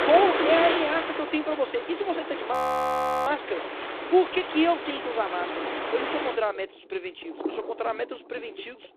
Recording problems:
phone-call audio; poor line; nothing above 15.5 kHz
rain or running water; loud; throughout; 4 dB below the speech
audio freezing; at 2.5 s for 0.5 s

